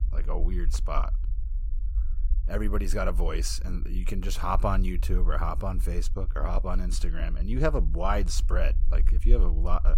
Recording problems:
low rumble; faint; throughout; 20 dB below the speech

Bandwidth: 16 kHz